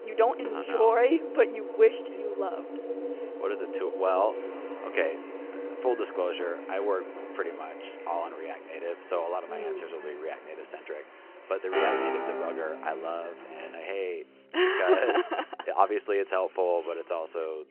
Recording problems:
phone-call audio
background music; loud; throughout; 8 dB below the speech
animal sounds; noticeable; until 14 s; 20 dB below the speech
voice in the background; faint; throughout; 30 dB below the speech

